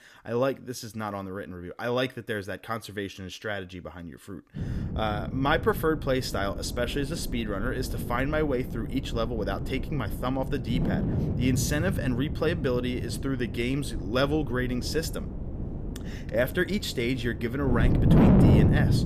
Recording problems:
wind noise on the microphone; heavy; from 4.5 s on; 6 dB below the speech

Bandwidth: 14.5 kHz